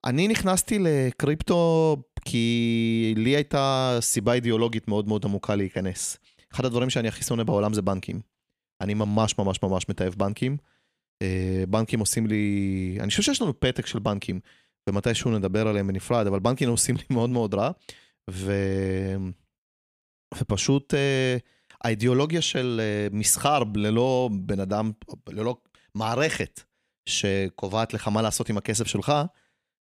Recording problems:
none

